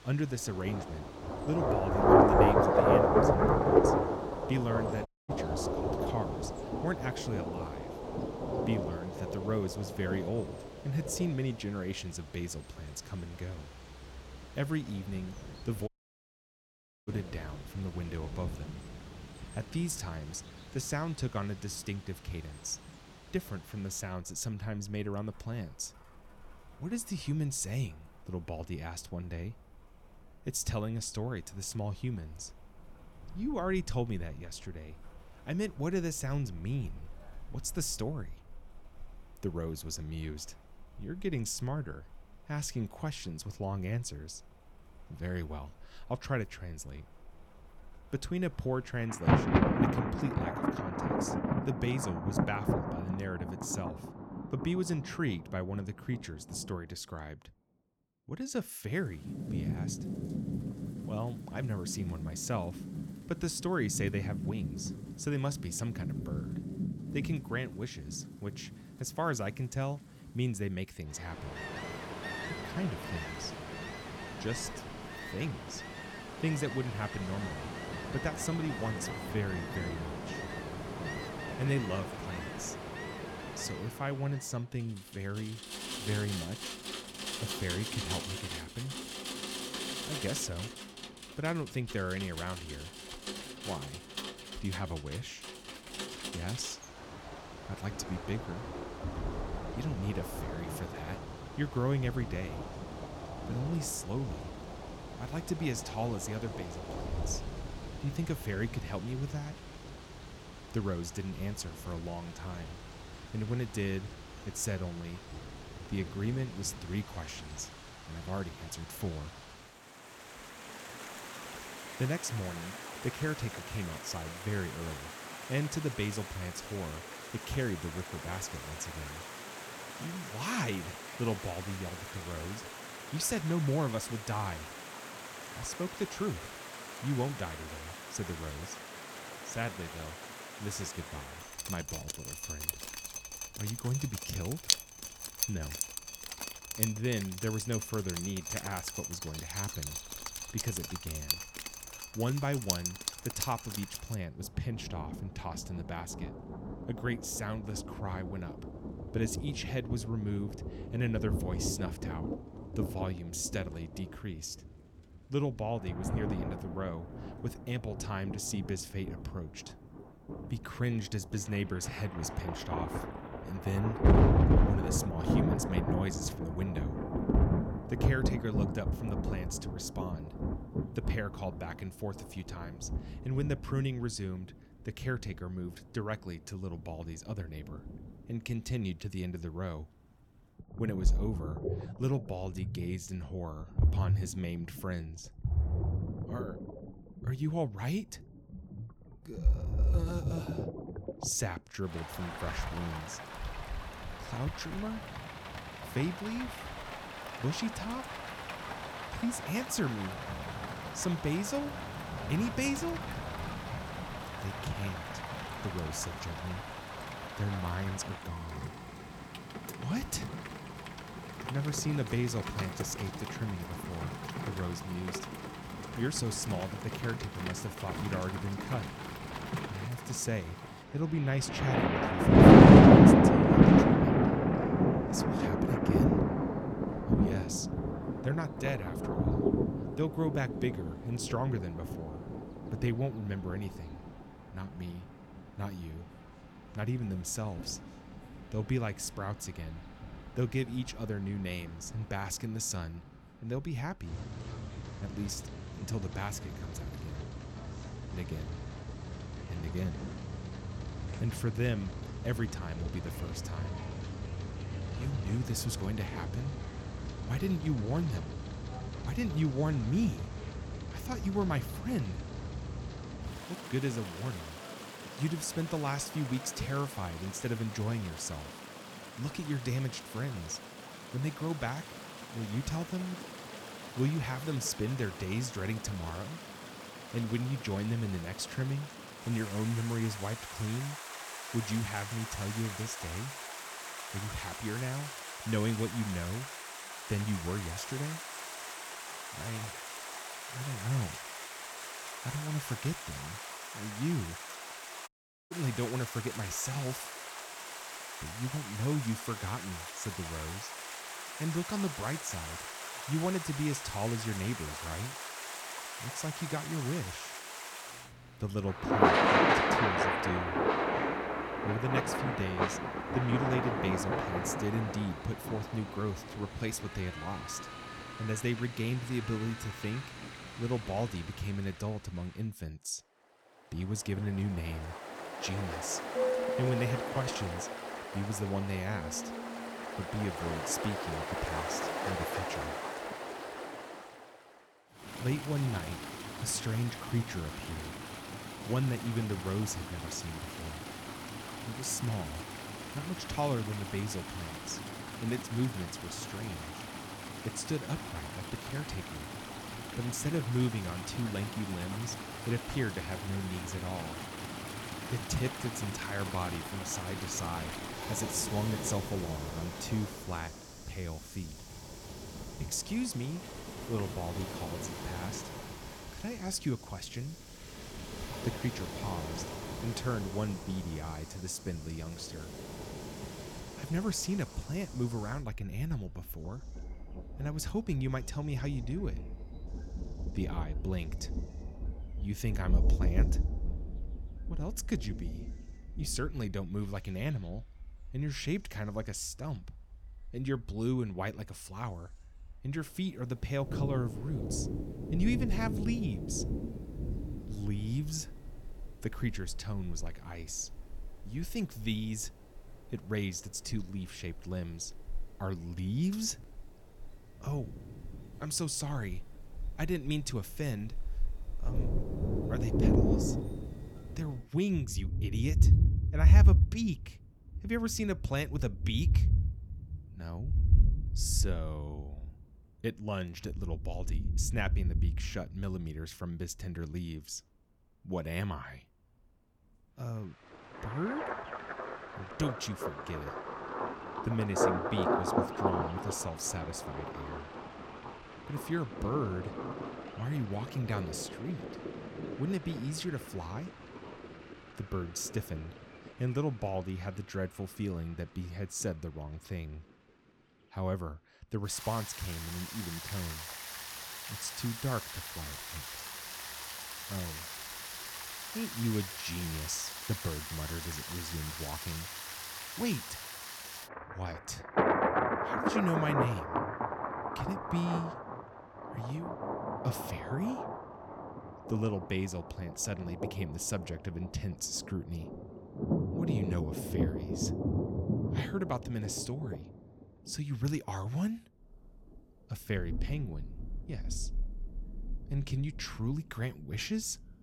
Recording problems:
rain or running water; very loud; throughout; 2 dB above the speech
audio cutting out; at 5 s, at 16 s for 1 s and at 5:05

